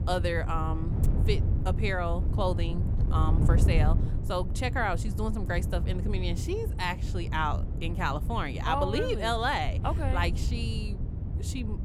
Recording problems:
wind noise on the microphone; occasional gusts; 10 dB below the speech

